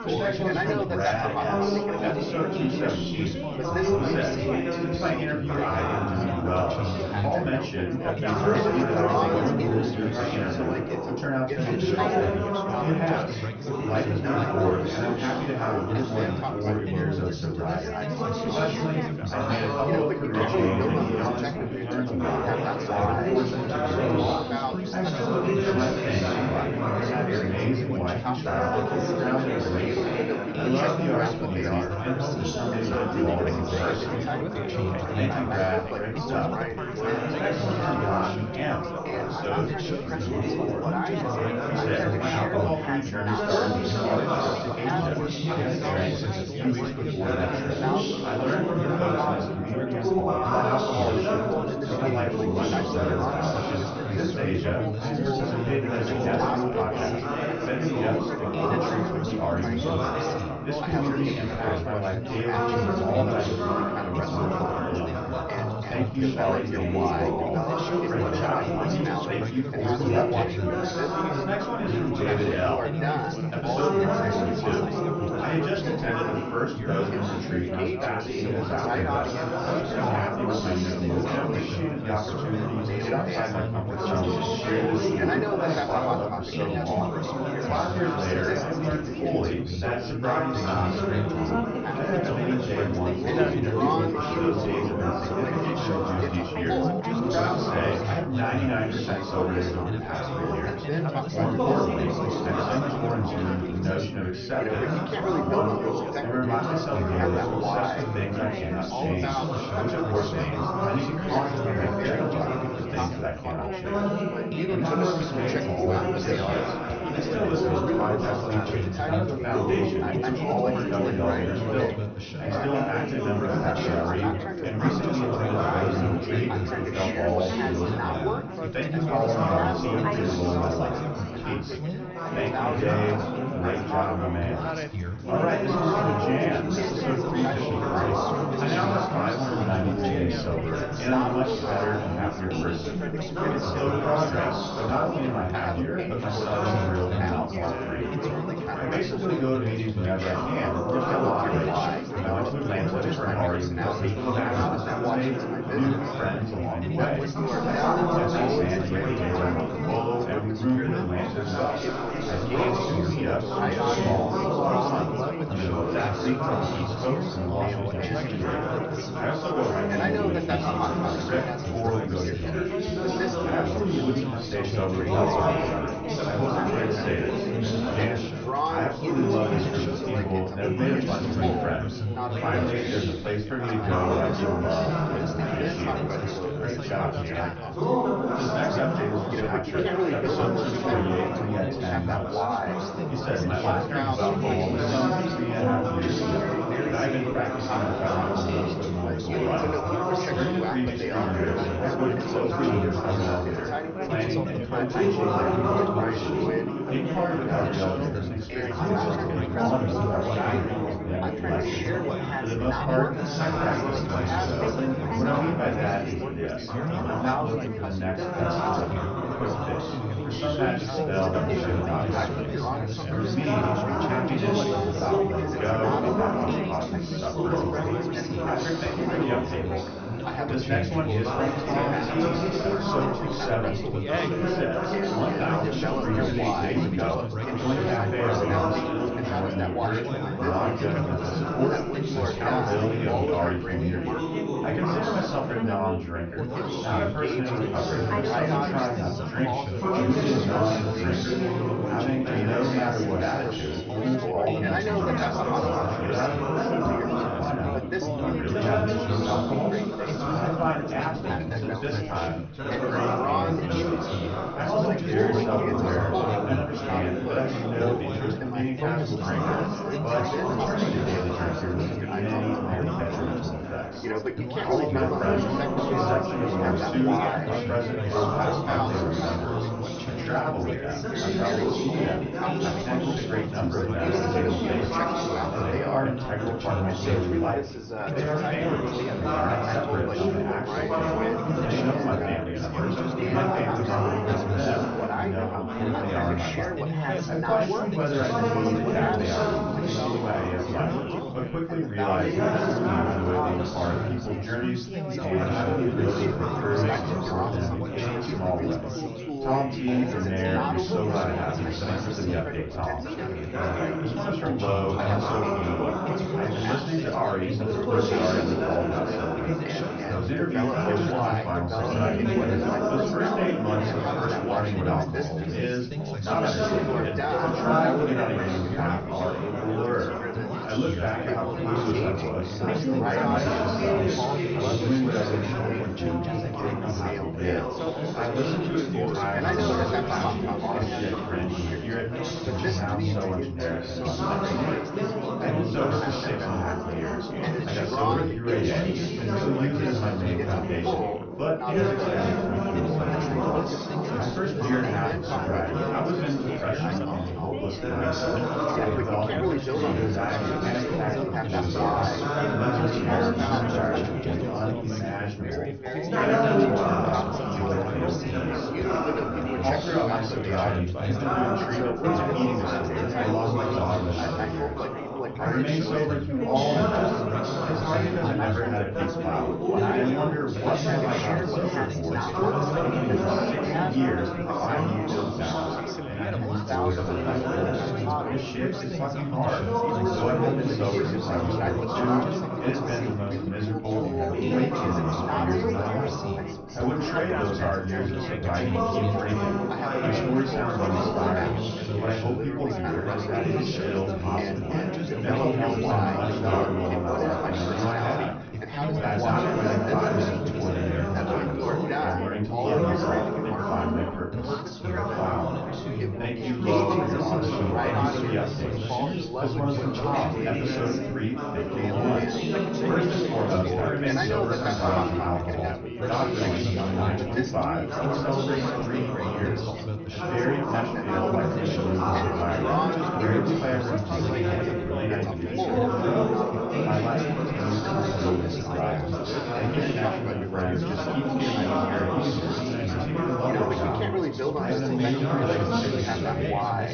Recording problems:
off-mic speech; far
high frequencies cut off; noticeable; nothing above 6.5 kHz
room echo; slight; dies away in 0.3 s
chatter from many people; very loud; throughout; 2 dB above the speech
background music; noticeable; from 2:19 on; 20 dB below the speech

